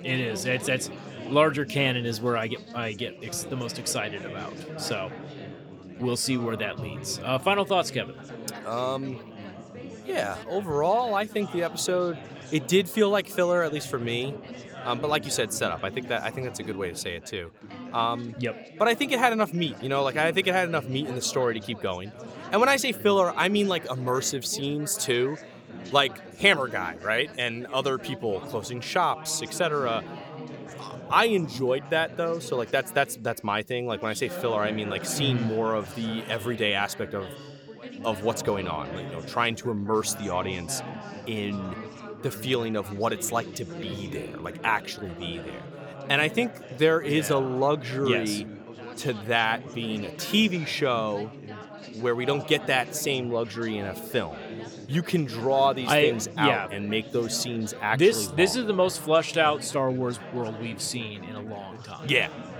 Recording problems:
chatter from many people; noticeable; throughout; 15 dB below the speech

